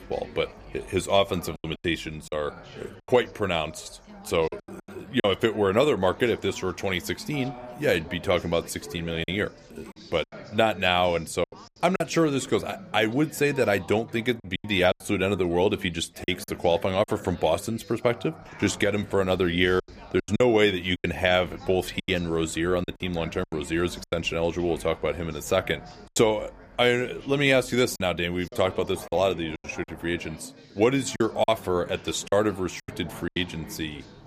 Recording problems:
background chatter; noticeable; throughout; 4 voices, 20 dB below the speech
choppy; very; 7% of the speech affected

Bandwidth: 15 kHz